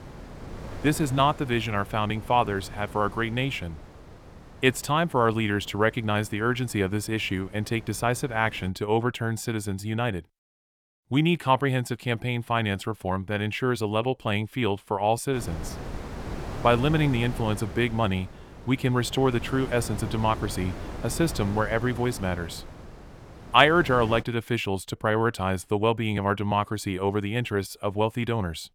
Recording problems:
wind noise on the microphone; occasional gusts; until 8.5 s and from 15 to 24 s; 15 dB below the speech

